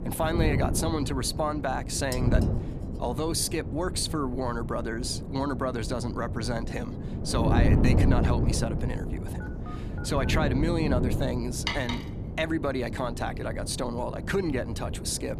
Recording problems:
wind noise on the microphone; heavy; 7 dB below the speech
clattering dishes; faint; at 2 s; peak 10 dB below the speech
phone ringing; faint; at 9.5 s; peak 15 dB below the speech
clattering dishes; noticeable; at 12 s; peak 1 dB below the speech

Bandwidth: 14.5 kHz